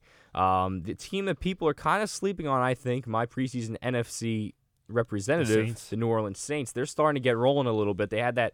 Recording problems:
none

